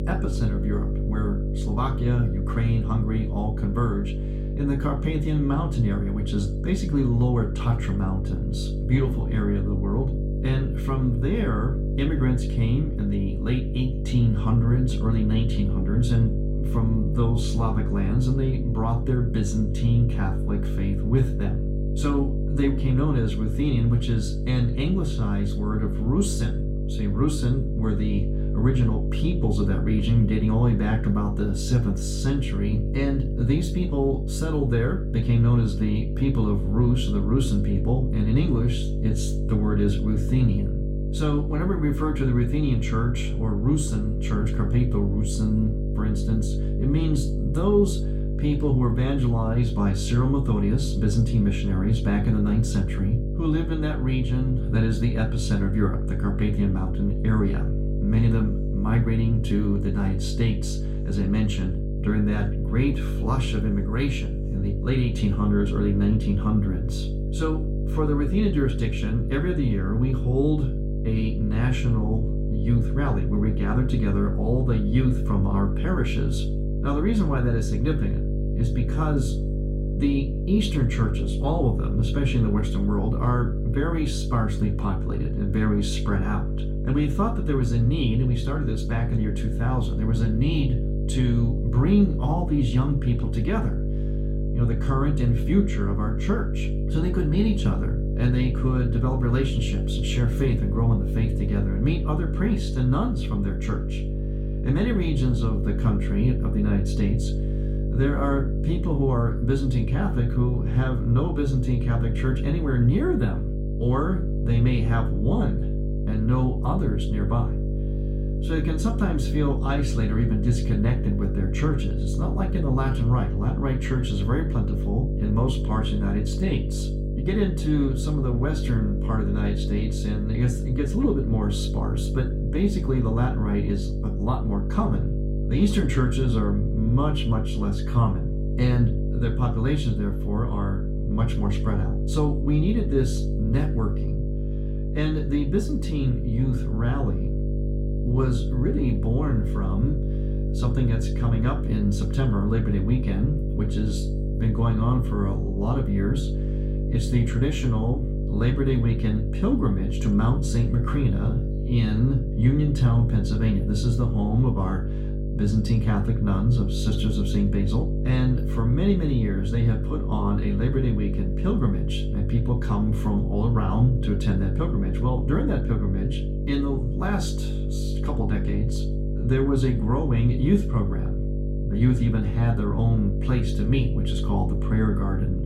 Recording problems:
off-mic speech; far
room echo; slight; dies away in 0.3 s
electrical hum; loud; throughout; 50 Hz, 6 dB below the speech

